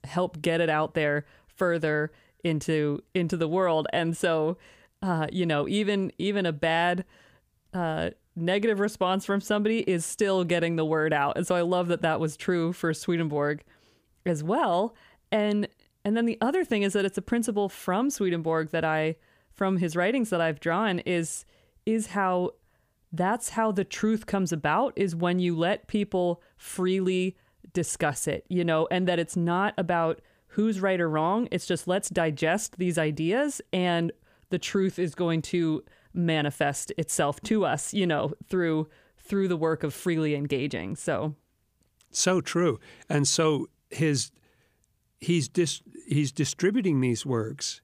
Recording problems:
none

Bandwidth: 15 kHz